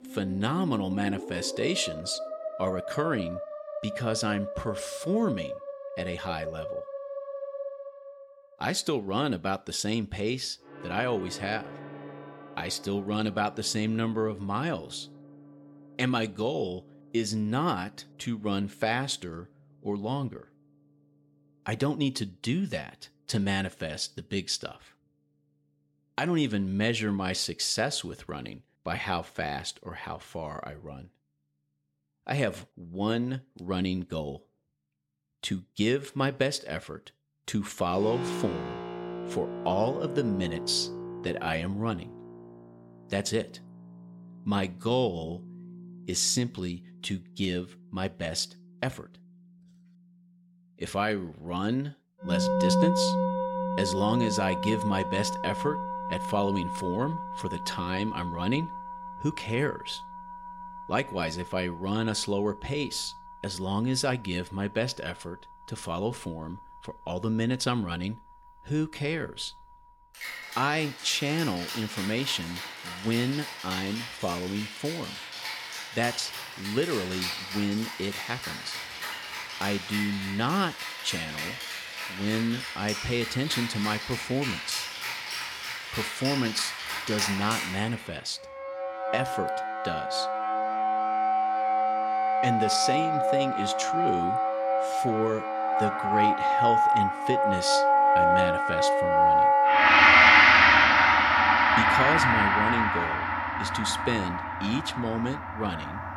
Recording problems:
background music; very loud; throughout; 4 dB above the speech

